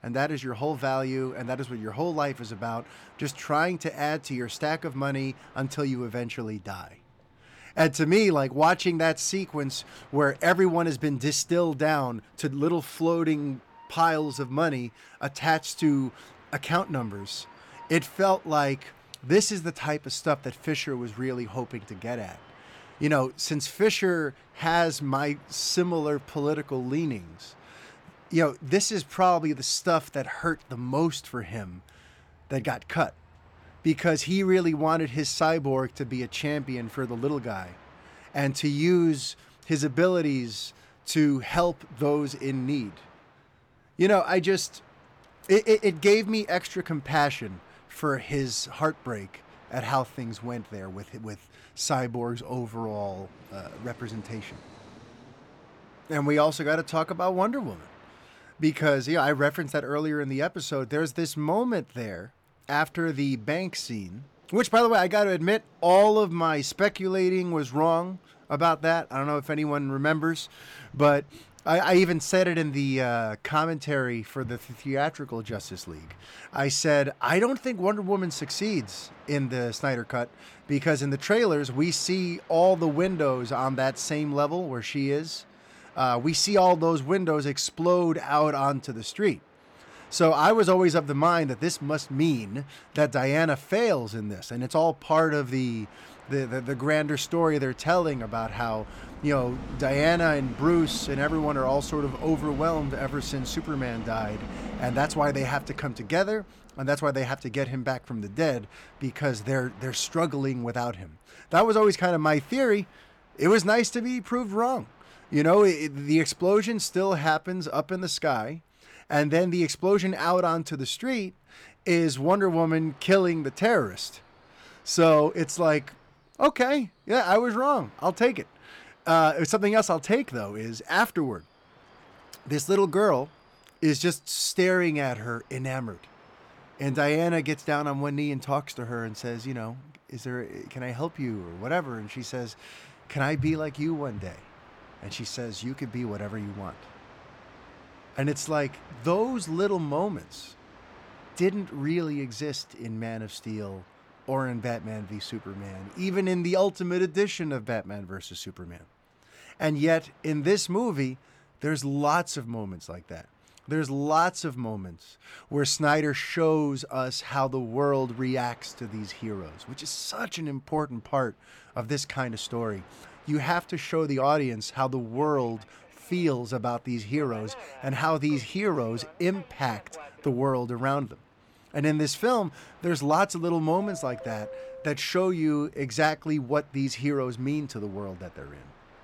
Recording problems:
train or aircraft noise; faint; throughout; 25 dB below the speech

